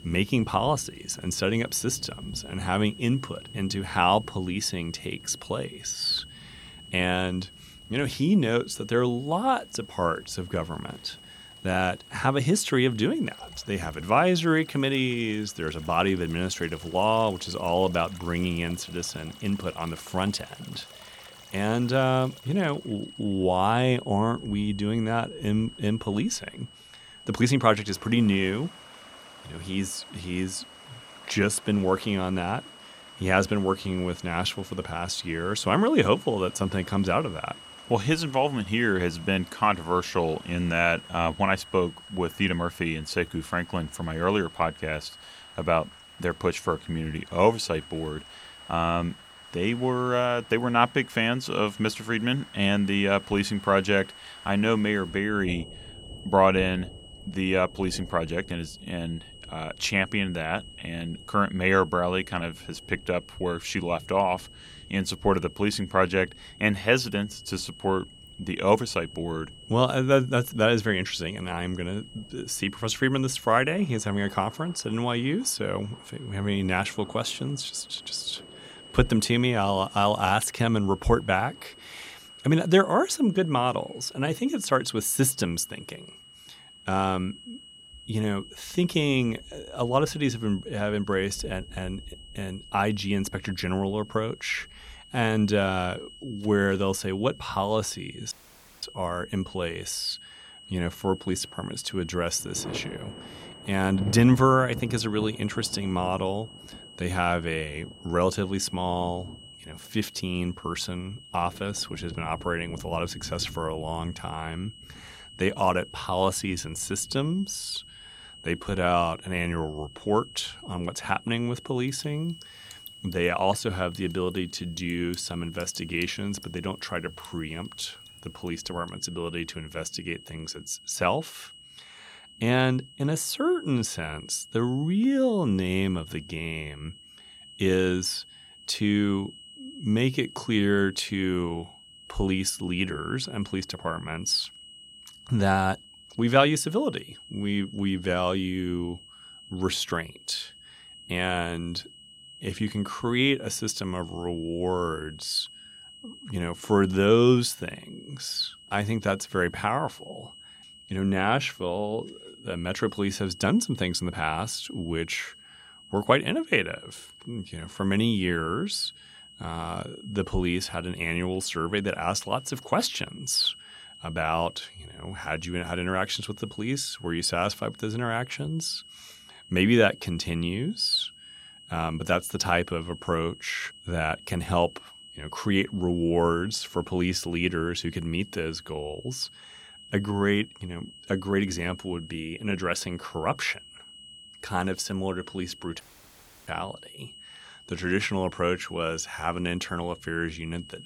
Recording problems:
high-pitched whine; noticeable; throughout; 3 kHz, 20 dB below the speech
rain or running water; faint; until 2:09; 20 dB below the speech
audio cutting out; at 1:38 for 0.5 s and at 3:16 for 0.5 s

